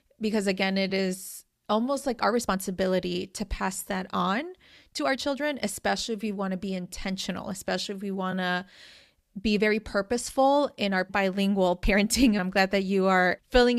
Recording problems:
uneven, jittery; strongly; from 0.5 to 12 s
abrupt cut into speech; at the end

